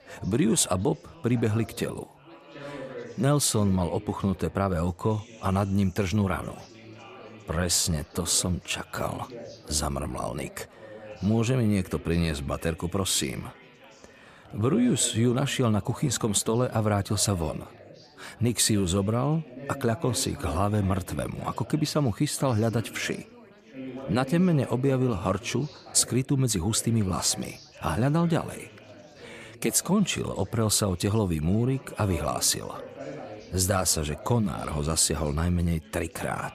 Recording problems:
chatter from many people; noticeable; throughout; 20 dB below the speech

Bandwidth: 14.5 kHz